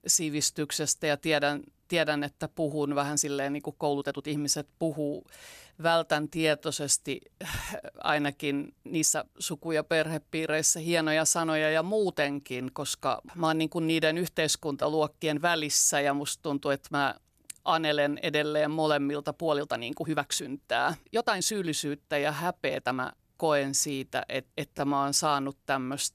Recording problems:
uneven, jittery; strongly; from 2.5 to 25 s

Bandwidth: 14.5 kHz